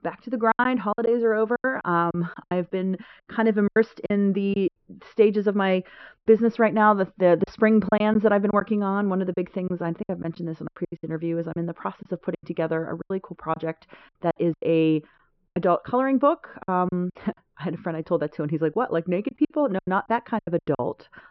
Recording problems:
high frequencies cut off; noticeable; nothing above 5.5 kHz
muffled; very slightly; fading above 3.5 kHz
choppy; very; 10% of the speech affected

